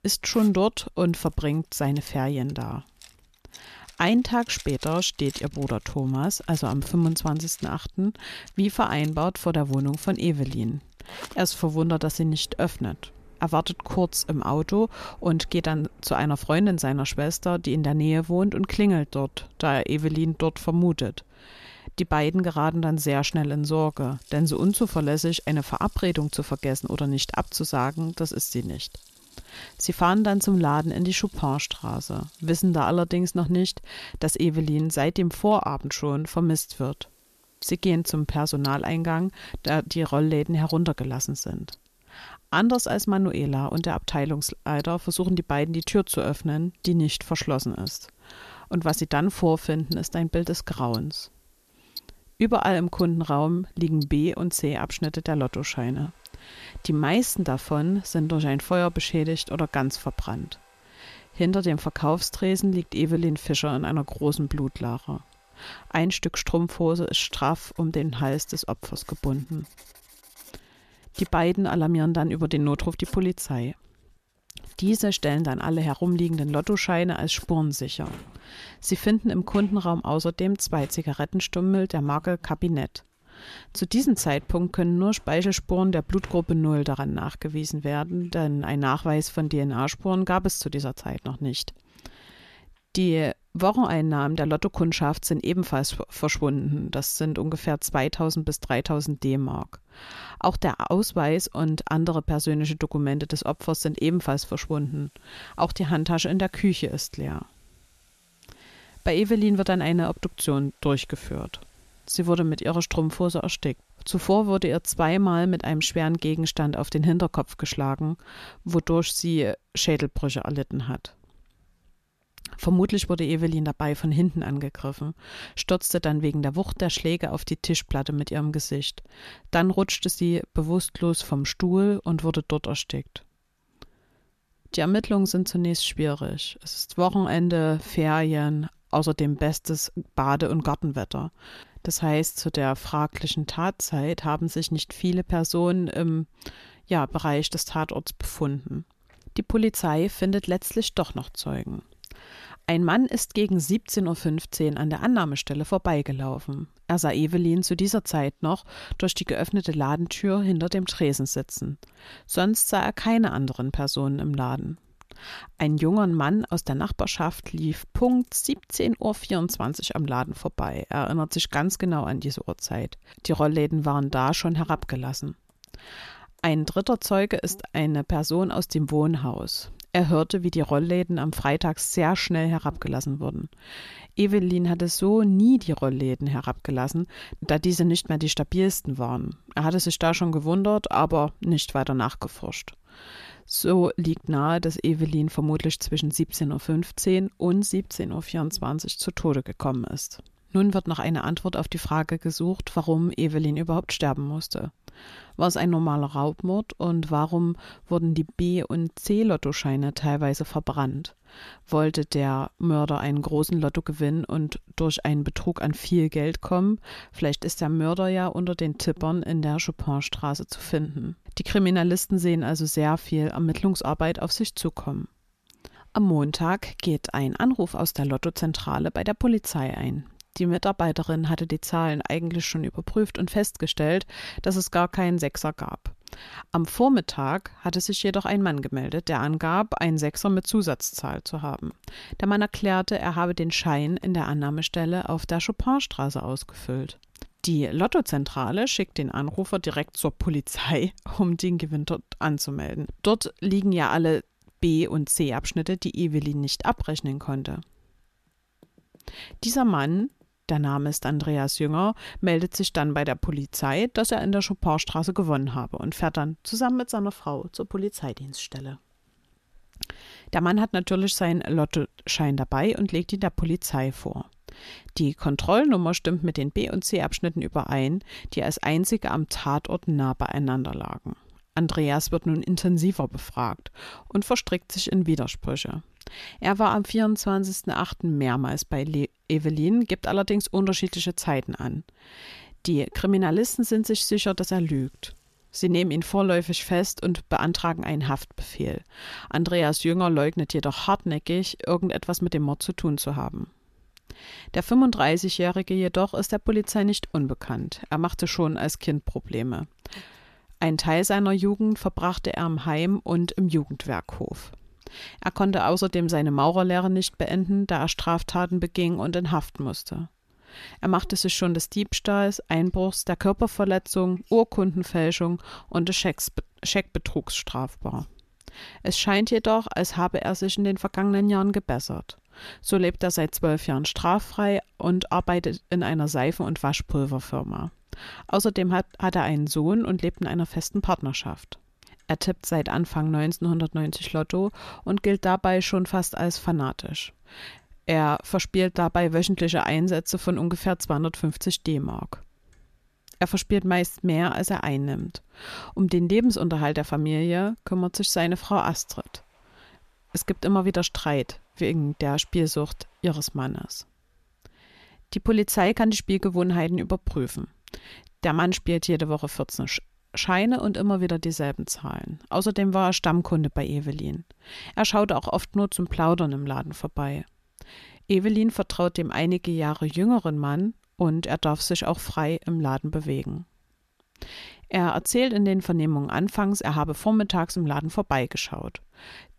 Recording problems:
household noises; faint; throughout; 25 dB below the speech

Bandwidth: 14 kHz